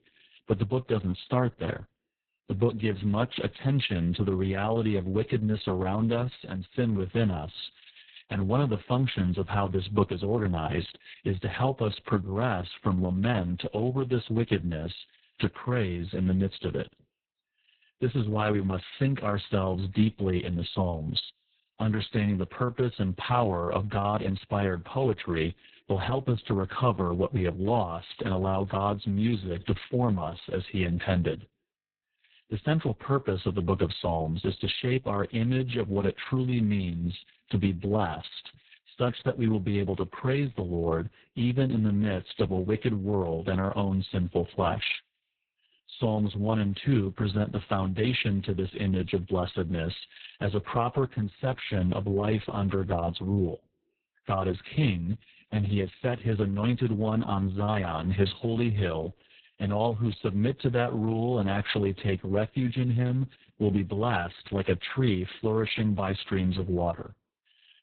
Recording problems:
garbled, watery; badly; nothing above 4 kHz

